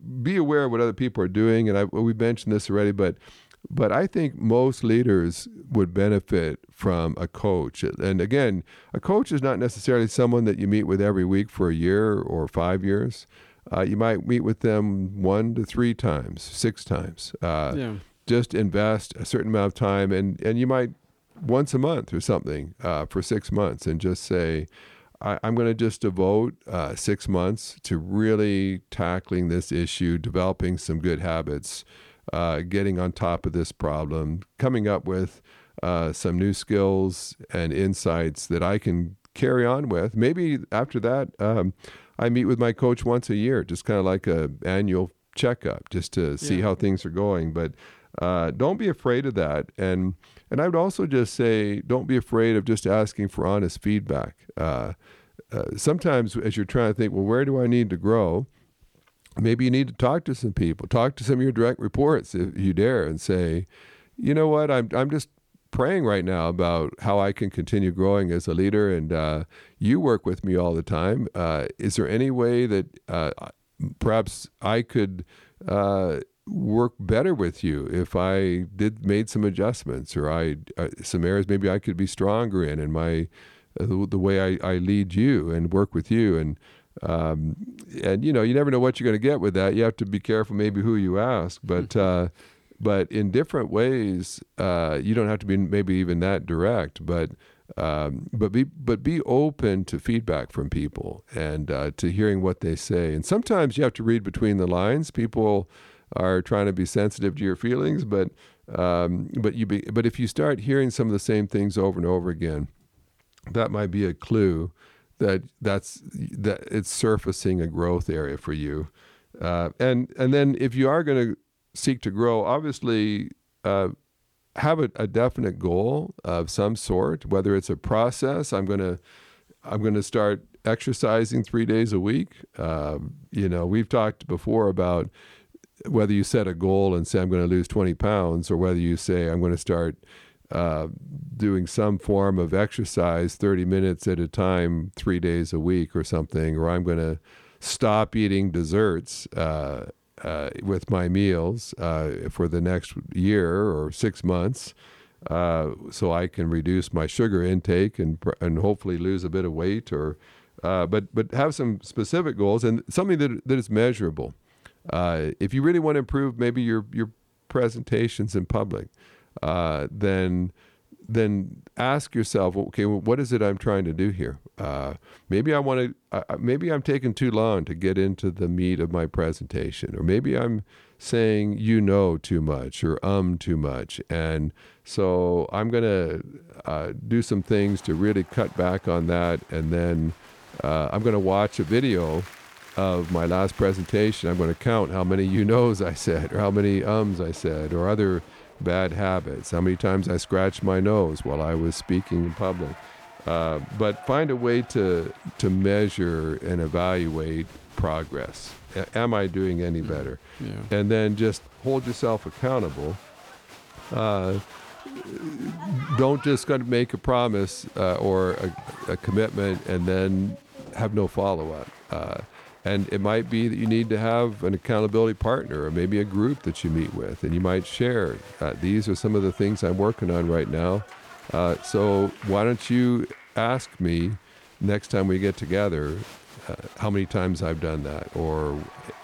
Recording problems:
crowd noise; faint; from 3:07 on; 20 dB below the speech

